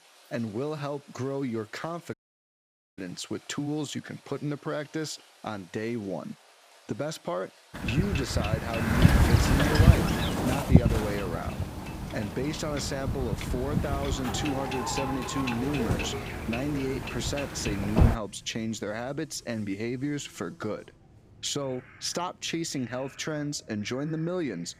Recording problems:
wind noise on the microphone; heavy; from 7.5 to 18 s; 2 dB above the speech
rain or running water; faint; throughout; 20 dB below the speech
animal sounds; faint; from 16 s on; 25 dB below the speech
audio cutting out; at 2 s for 1 s

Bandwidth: 15.5 kHz